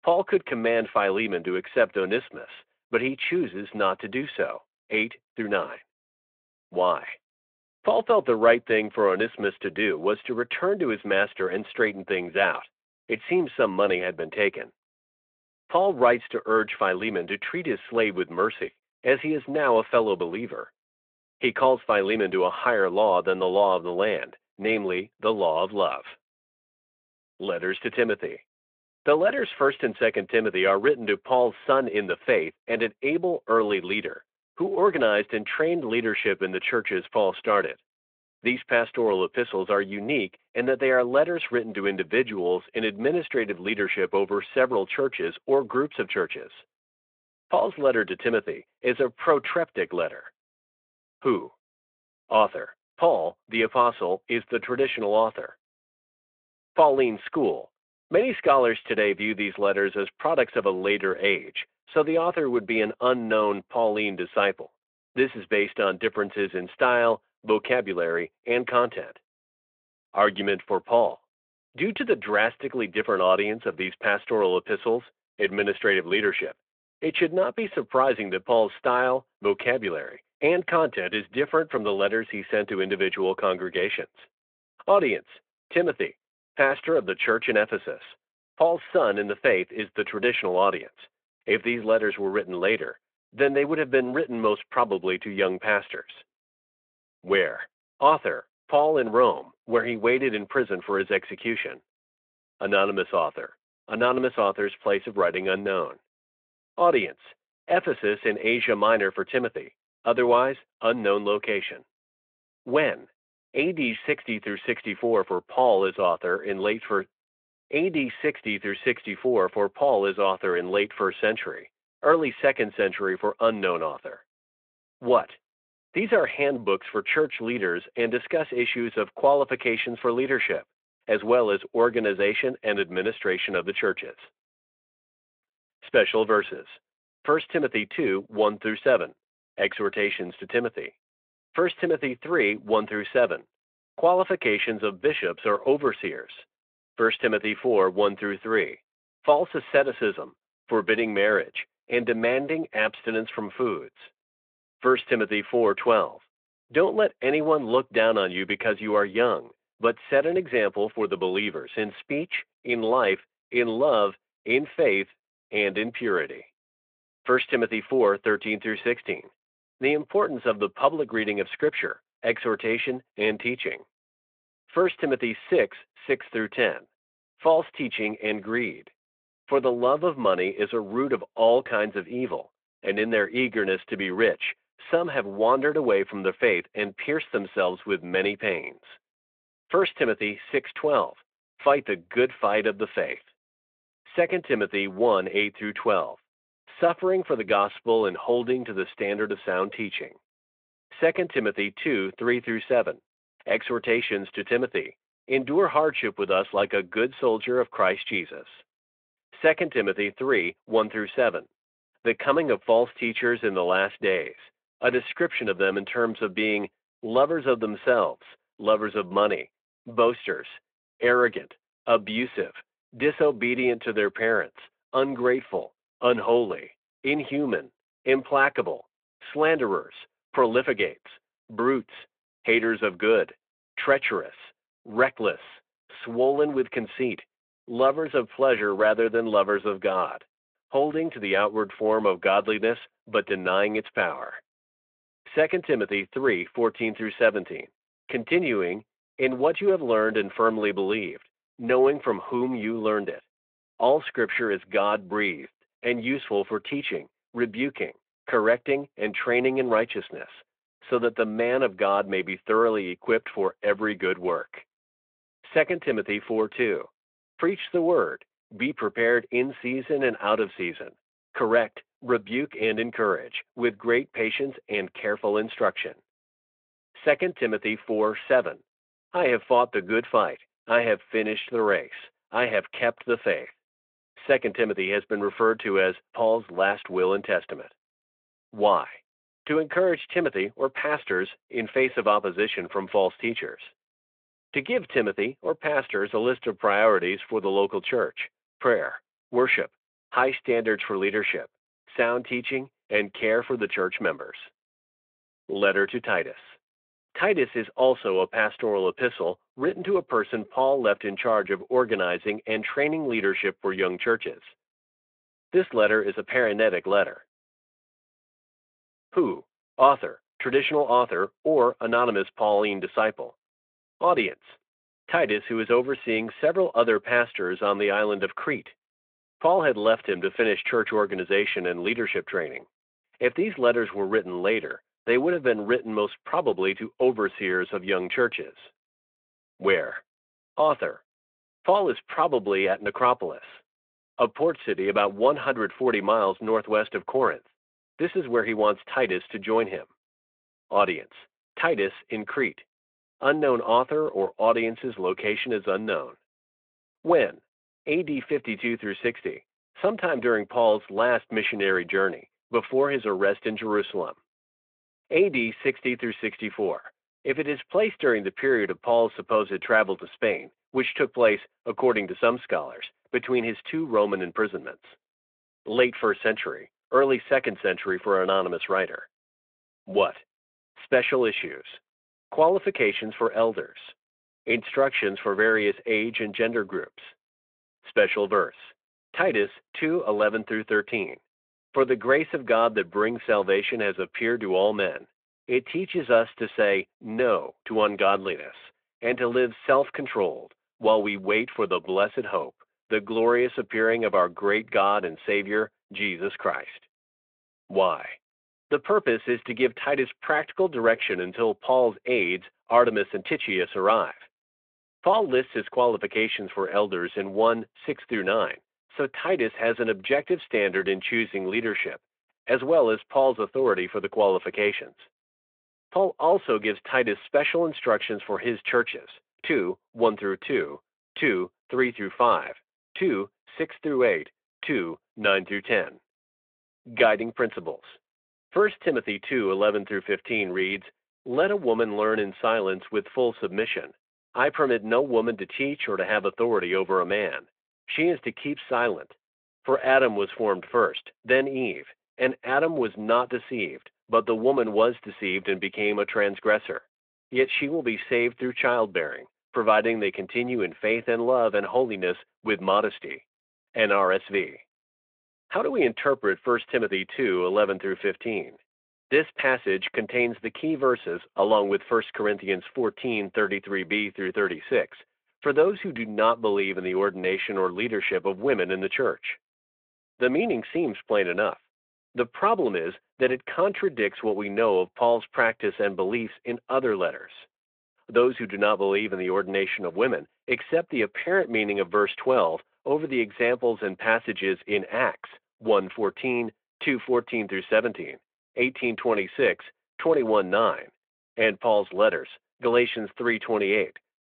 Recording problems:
phone-call audio

